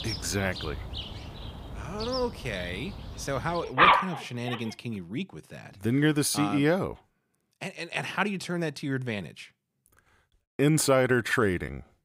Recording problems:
animal sounds; very loud; until 4.5 s; 1 dB above the speech

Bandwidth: 15.5 kHz